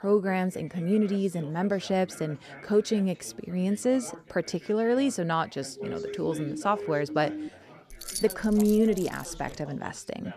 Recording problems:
background chatter; noticeable; throughout; 4 voices, 20 dB below the speech
siren; noticeable; from 6 to 7.5 s; peak 8 dB below the speech
jangling keys; noticeable; from 8 to 9.5 s; peak 6 dB below the speech

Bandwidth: 14 kHz